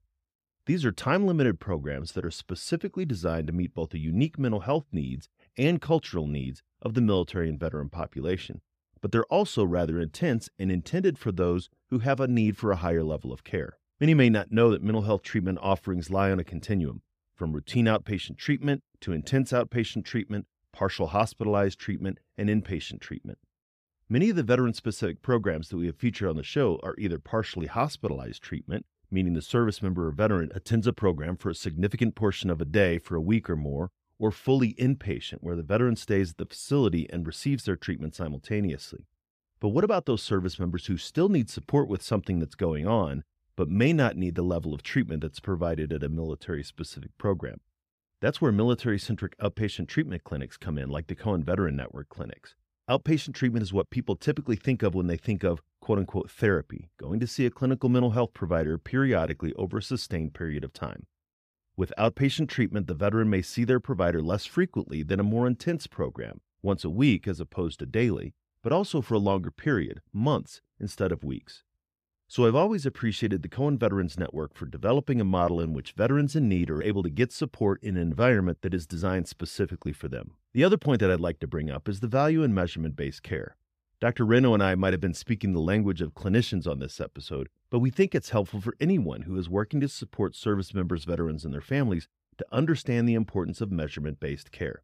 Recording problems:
none

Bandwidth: 15 kHz